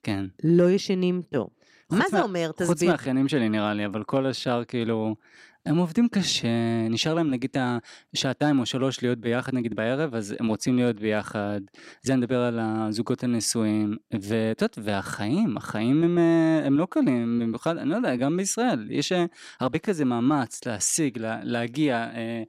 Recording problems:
uneven, jittery; strongly; from 1 to 21 s

